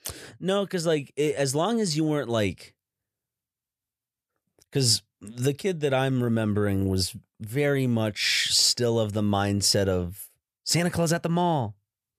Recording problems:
none

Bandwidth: 14.5 kHz